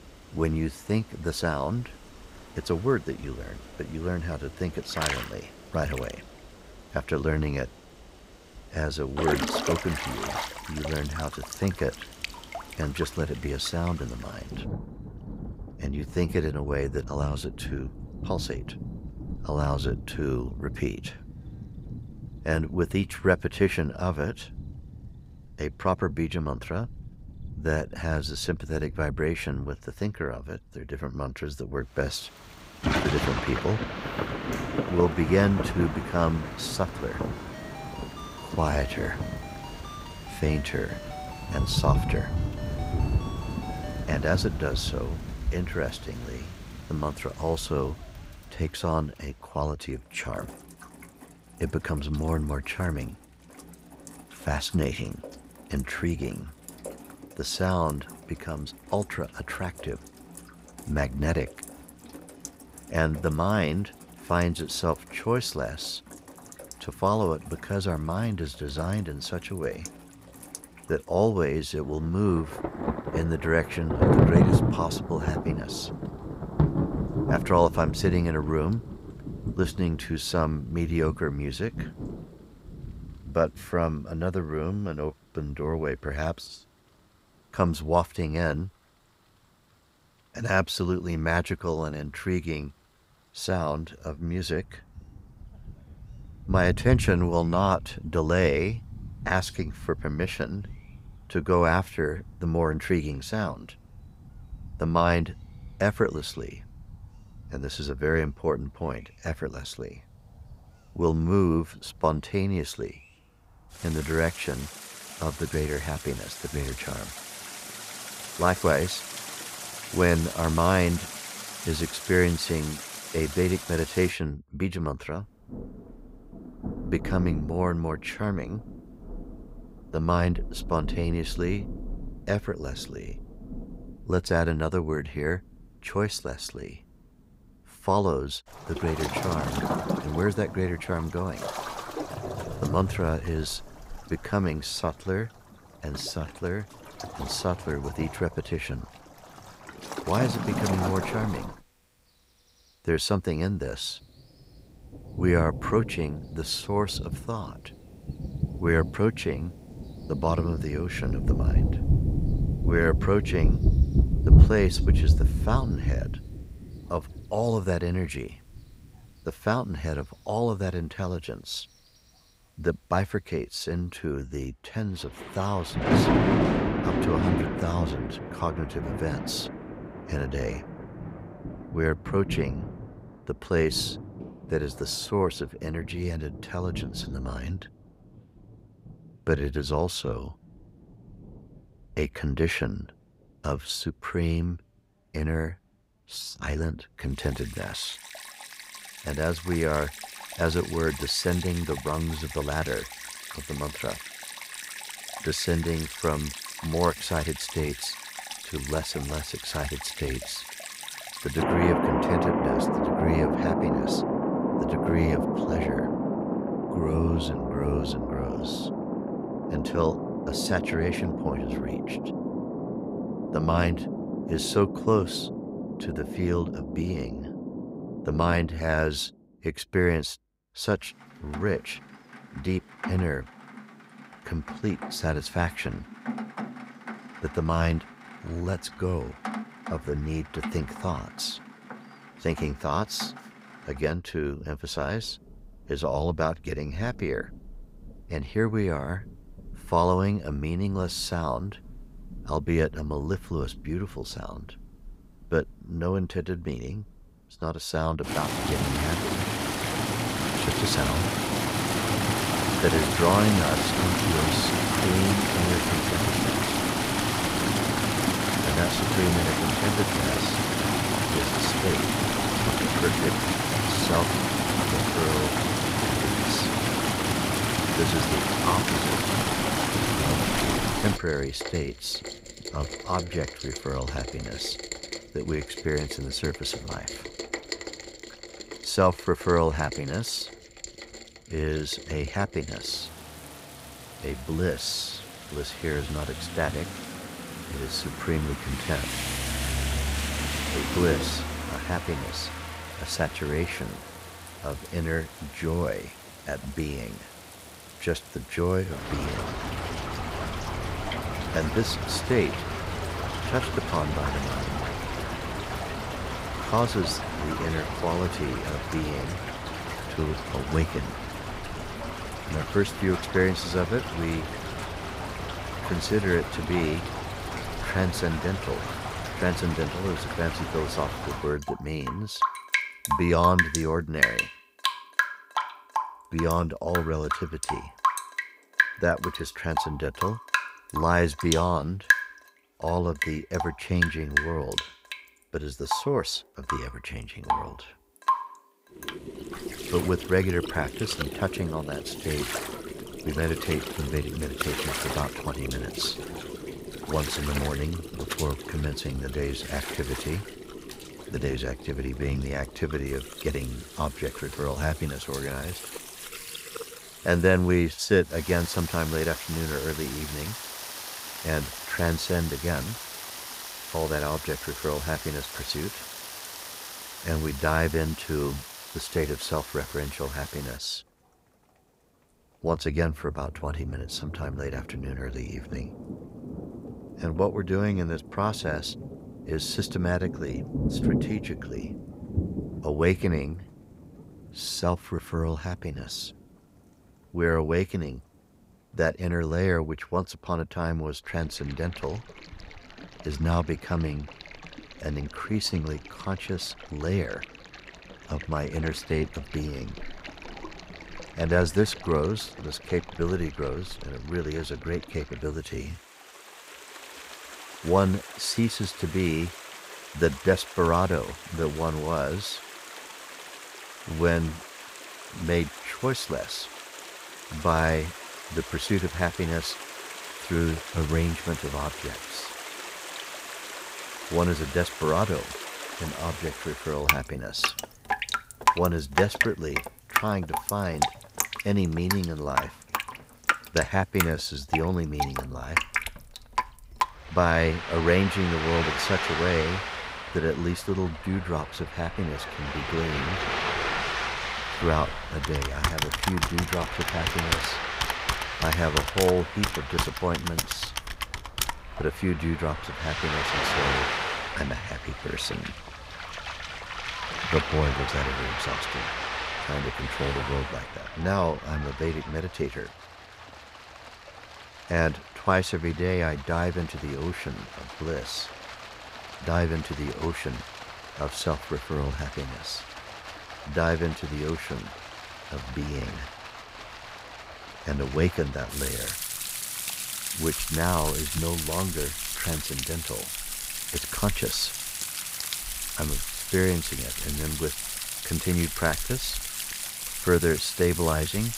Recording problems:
rain or running water; loud; throughout; 2 dB below the speech
phone ringing; faint; from 37 to 44 s; peak 10 dB below the speech
keyboard typing; loud; from 7:35 to 7:42; peak 2 dB above the speech

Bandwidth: 15.5 kHz